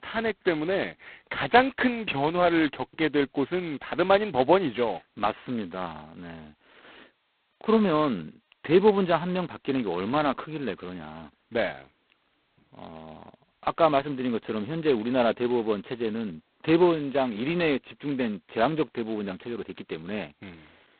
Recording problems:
phone-call audio; poor line; nothing above 4 kHz

